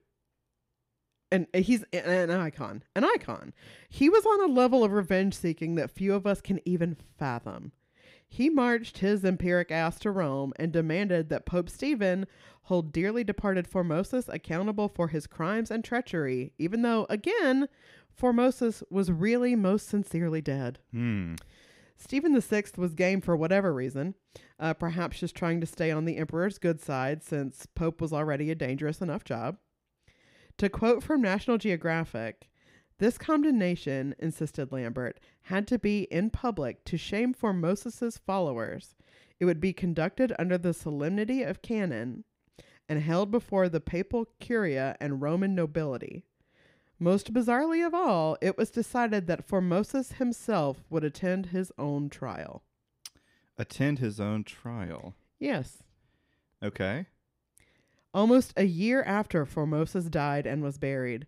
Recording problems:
none

